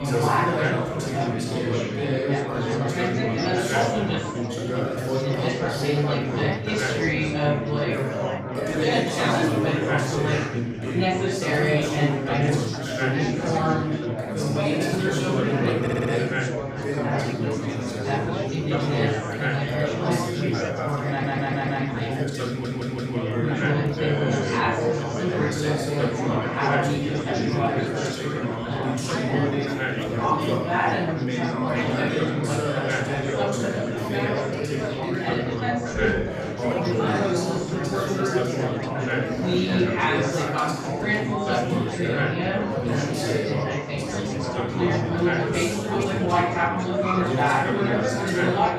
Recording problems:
room echo; strong; dies away in 1.4 s
off-mic speech; far
chatter from many people; very loud; throughout; 5 dB above the speech
audio stuttering; at 16 s, at 21 s and at 22 s

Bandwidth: 15 kHz